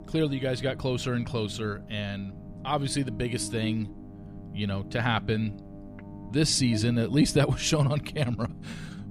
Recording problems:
electrical hum; noticeable; throughout; 50 Hz, 20 dB below the speech
low rumble; faint; throughout; 20 dB below the speech

